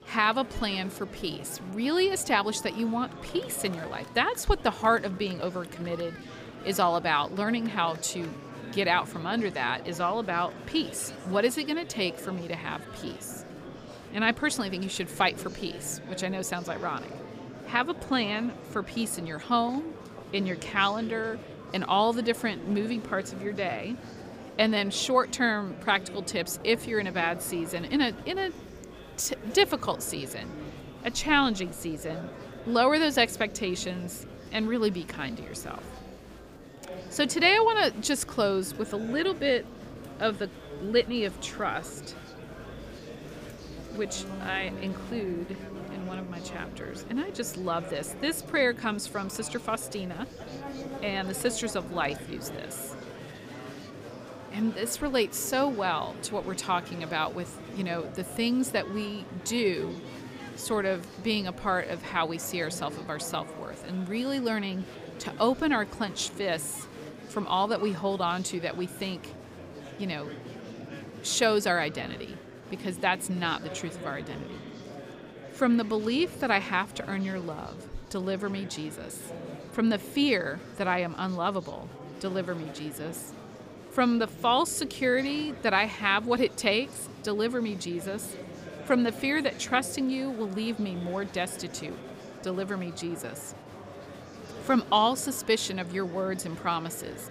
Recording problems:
murmuring crowd; noticeable; throughout; 15 dB below the speech
background music; faint; throughout; 25 dB below the speech

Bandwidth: 15 kHz